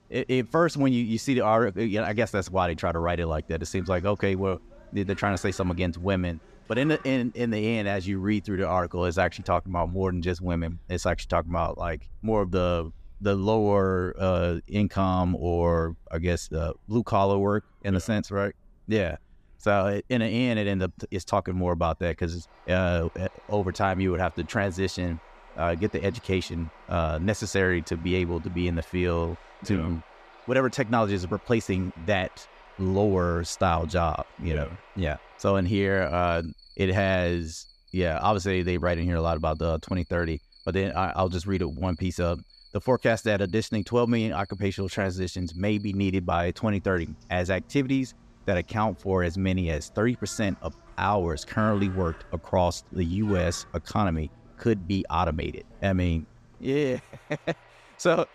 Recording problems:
animal sounds; faint; throughout; 25 dB below the speech

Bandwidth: 14.5 kHz